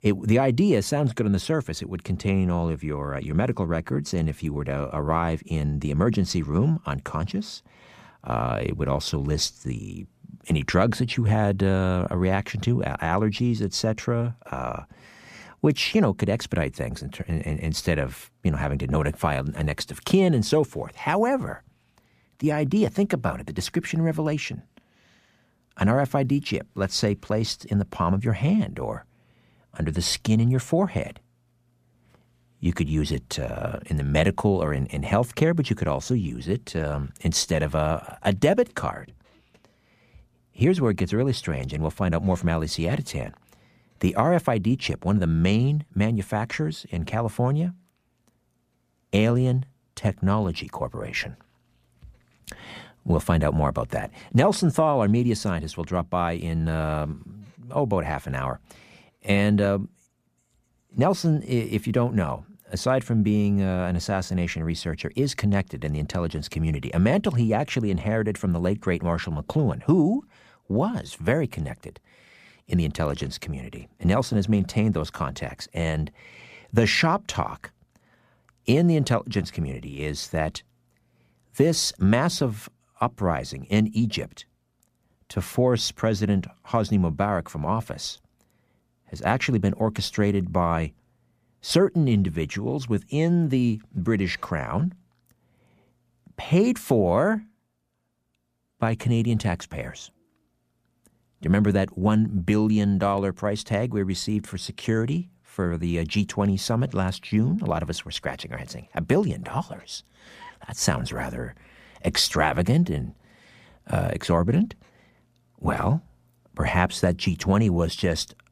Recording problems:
none

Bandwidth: 15 kHz